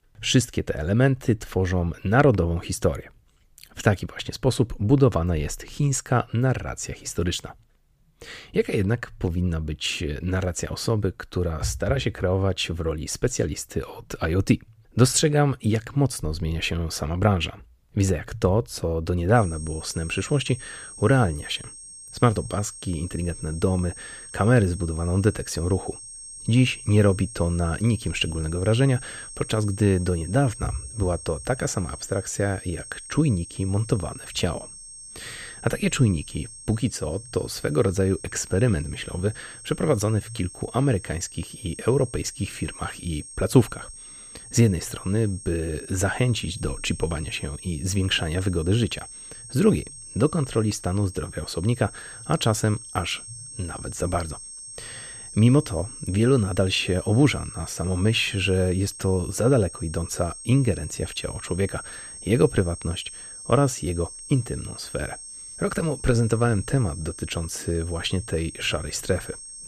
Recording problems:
high-pitched whine; noticeable; from 19 s on; 8.5 kHz, 15 dB below the speech

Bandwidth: 15 kHz